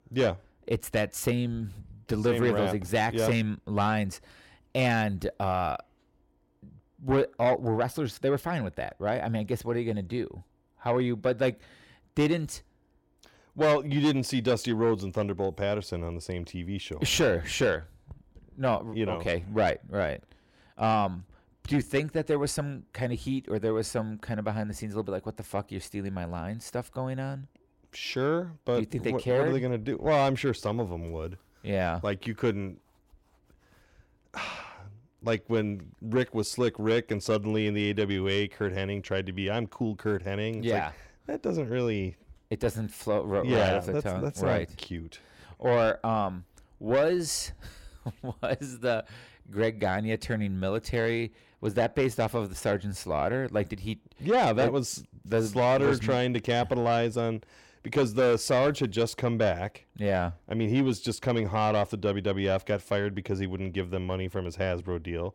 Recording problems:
distortion; slight; 10 dB below the speech

